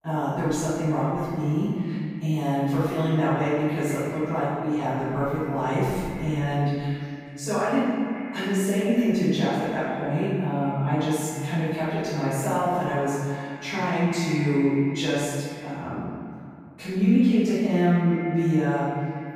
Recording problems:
room echo; strong; dies away in 1.7 s
off-mic speech; far
echo of what is said; noticeable; throughout; 190 ms later, 15 dB below the speech

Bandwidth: 15.5 kHz